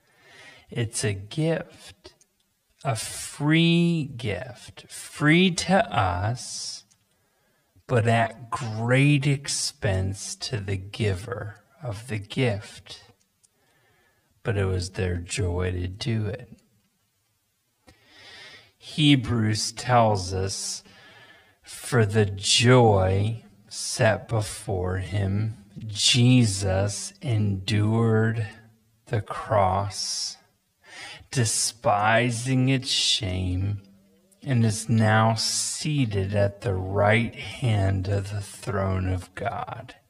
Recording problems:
wrong speed, natural pitch; too slow; 0.5 times normal speed

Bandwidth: 15 kHz